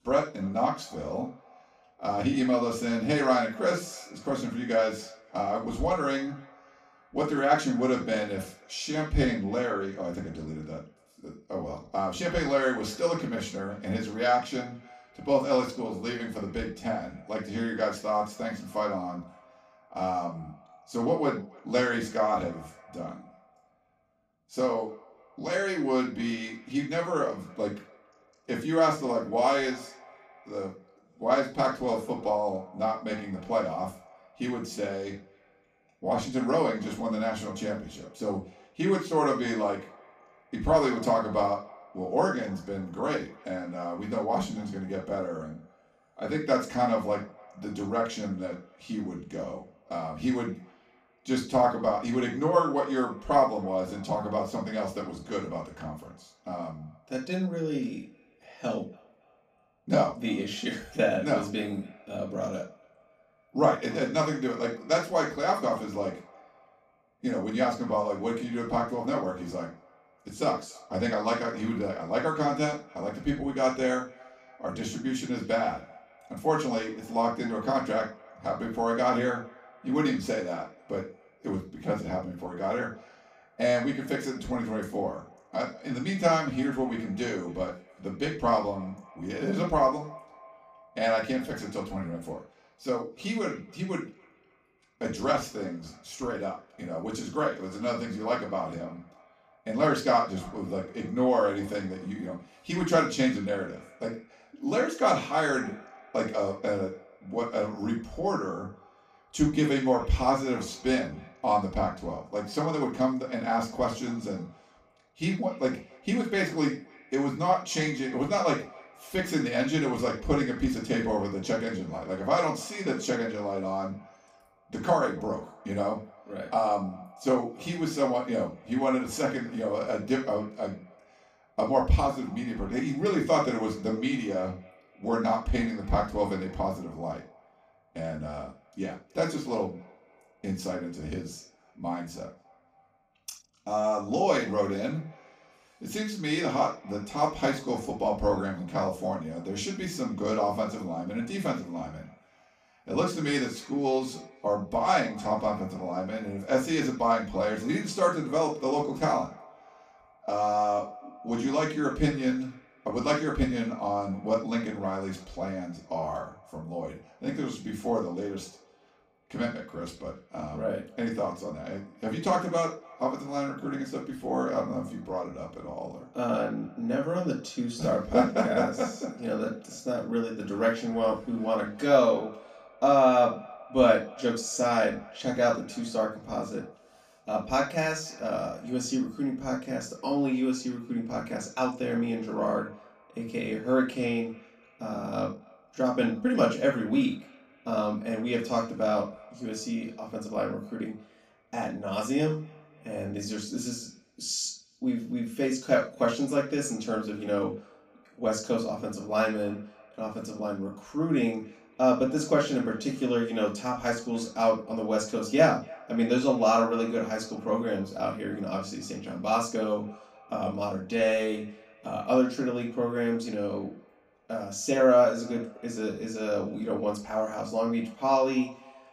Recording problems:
off-mic speech; far
echo of what is said; faint; throughout; 280 ms later, 25 dB below the speech
room echo; slight; dies away in 0.3 s

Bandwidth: 15.5 kHz